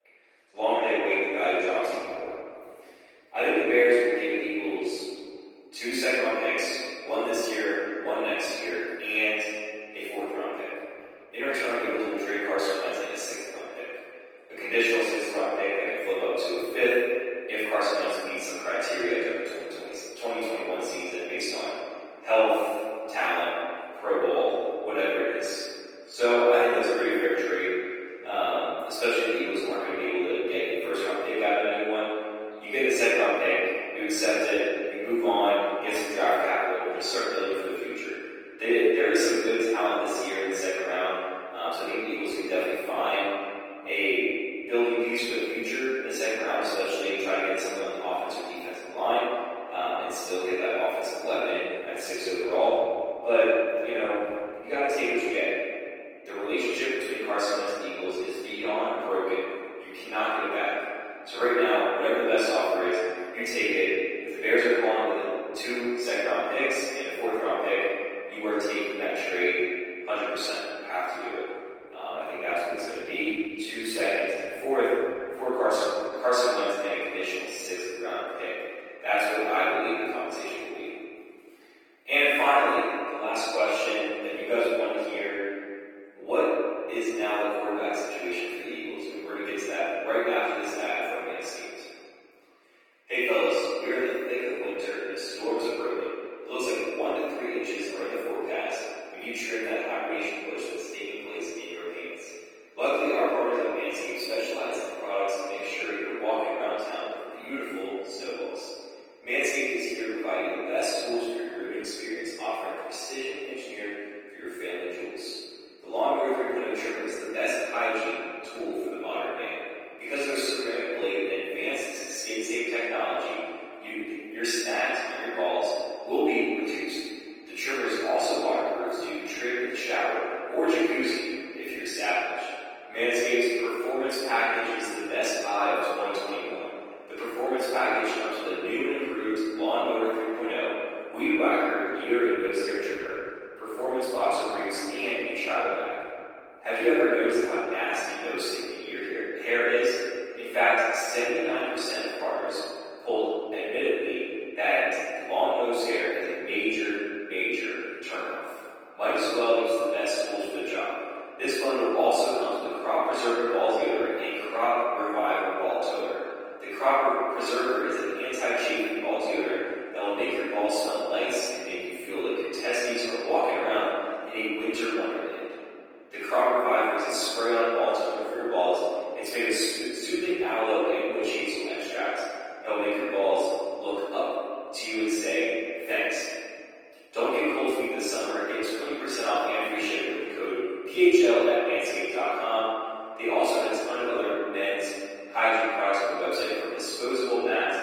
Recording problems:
room echo; strong; dies away in 2.2 s
off-mic speech; far
thin; somewhat; fading below 300 Hz
garbled, watery; slightly; nothing above 17.5 kHz

